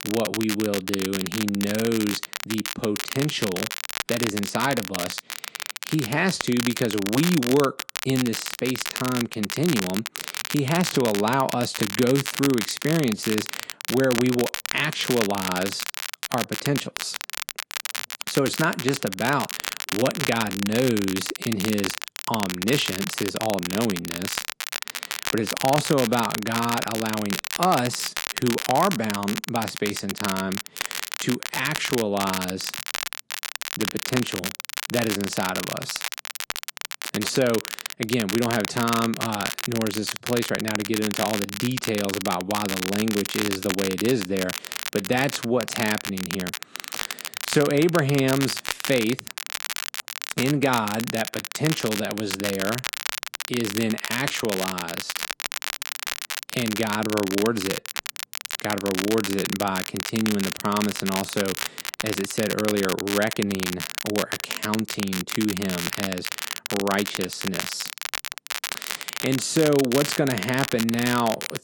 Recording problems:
garbled, watery; slightly; nothing above 11 kHz
crackle, like an old record; loud; 4 dB below the speech

